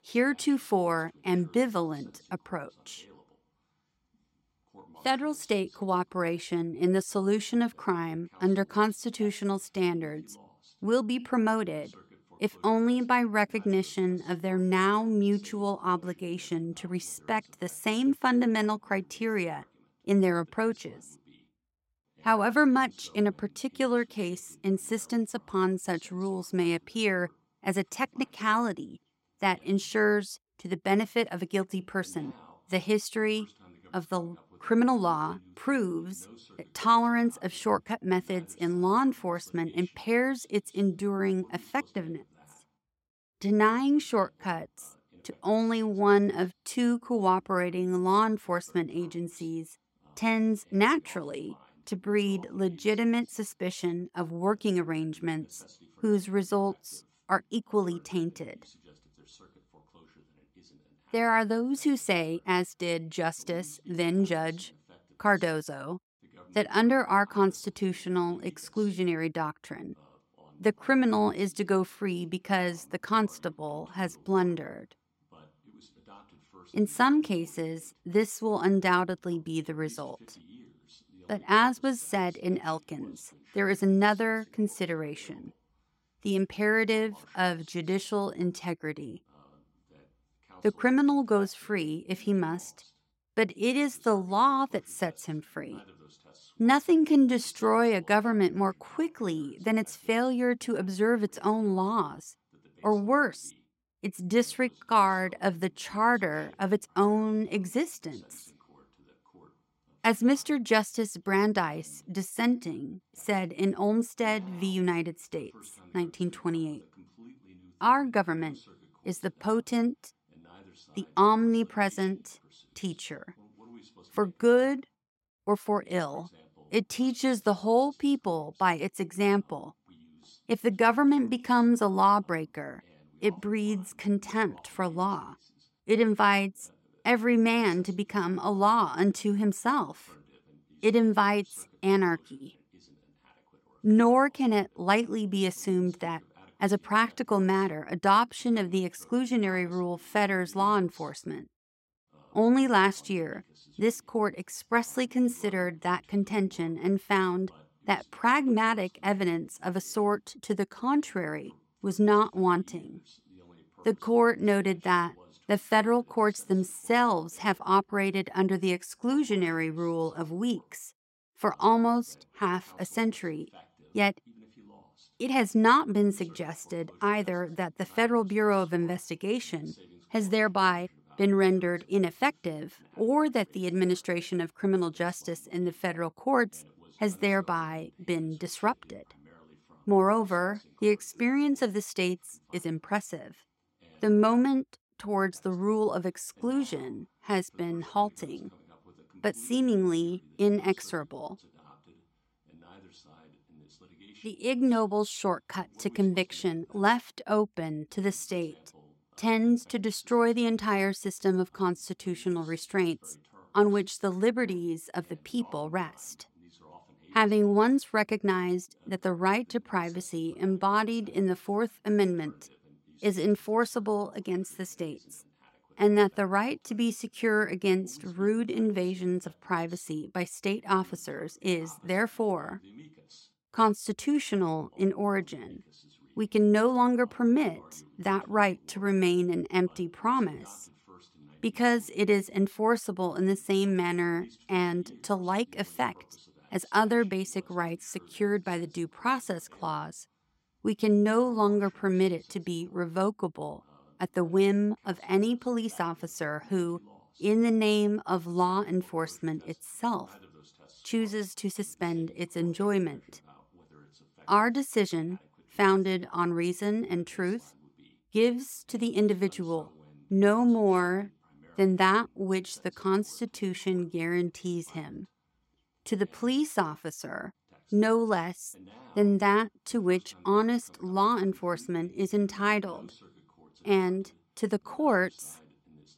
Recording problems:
voice in the background; faint; throughout; 30 dB below the speech

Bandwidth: 16 kHz